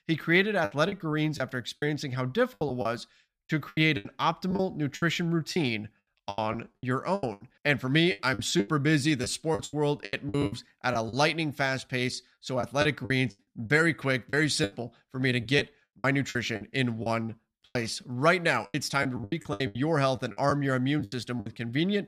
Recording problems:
choppy; very; 14% of the speech affected

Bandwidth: 14.5 kHz